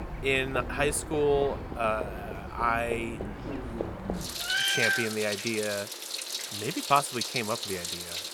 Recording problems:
animal sounds; loud; throughout; 3 dB below the speech

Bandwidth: 18 kHz